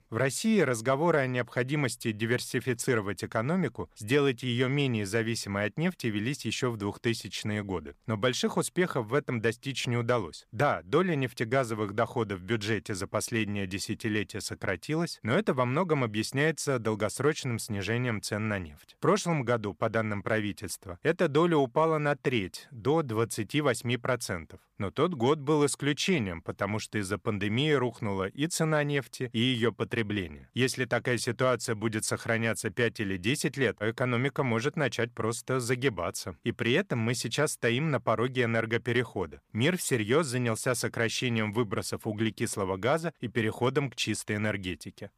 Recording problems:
none

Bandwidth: 15 kHz